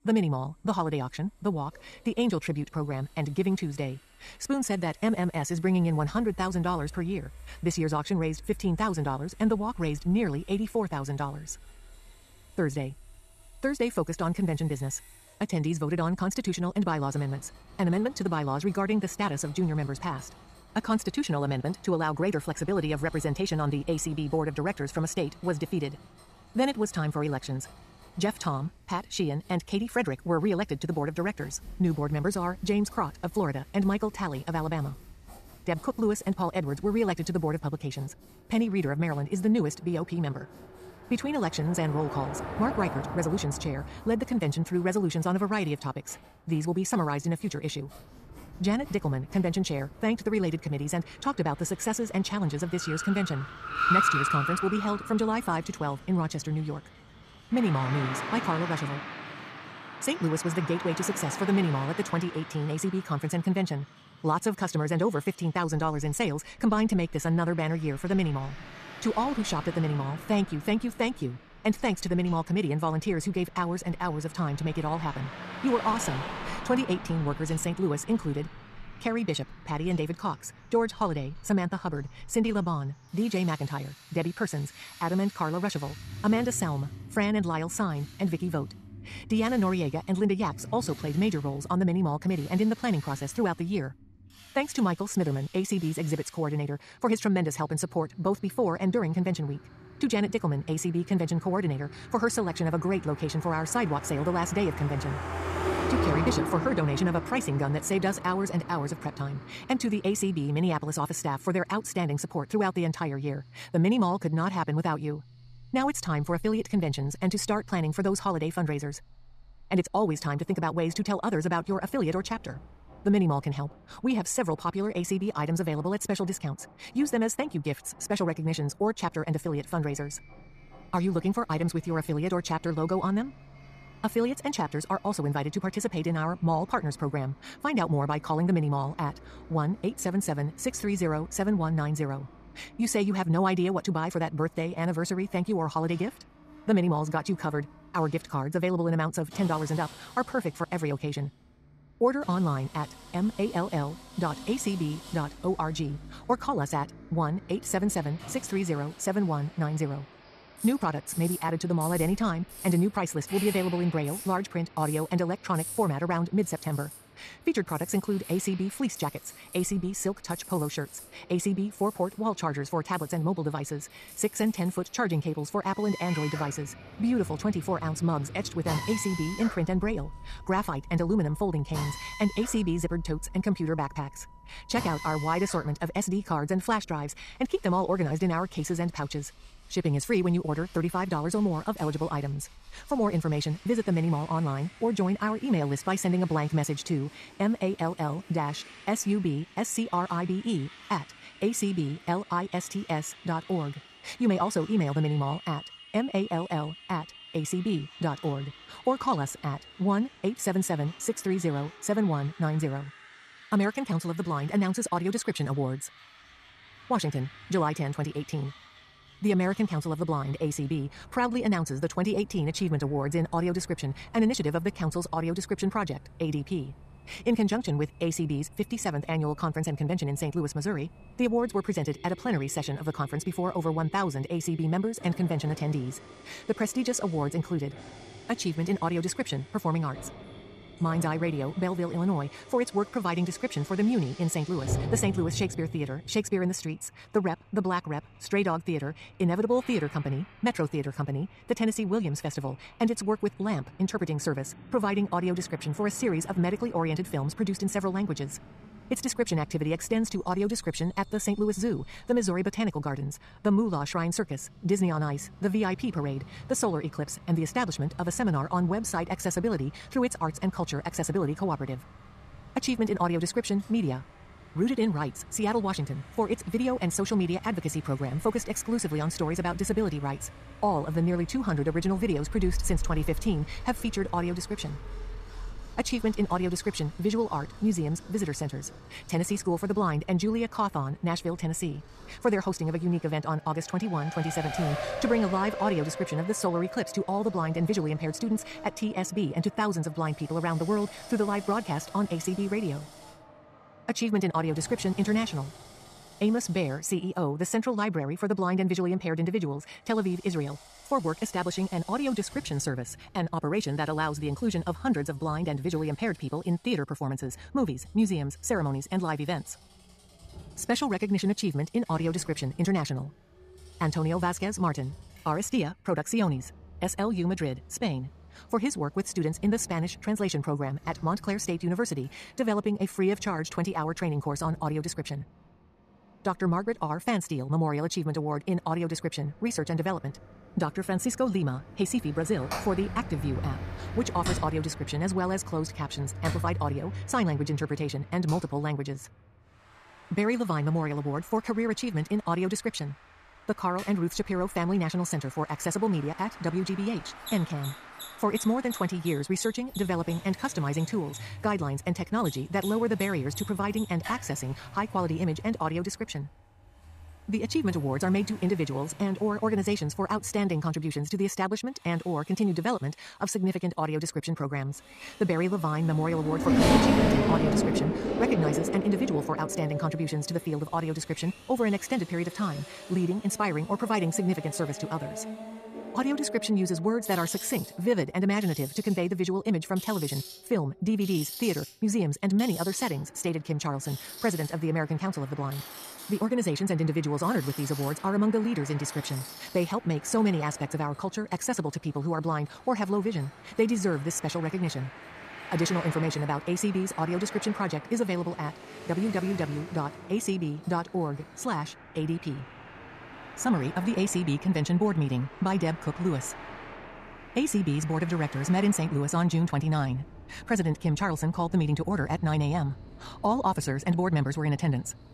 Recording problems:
wrong speed, natural pitch; too fast; 1.6 times normal speed
traffic noise; noticeable; throughout; 10 dB below the speech
machinery noise; faint; throughout; 20 dB below the speech

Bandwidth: 14.5 kHz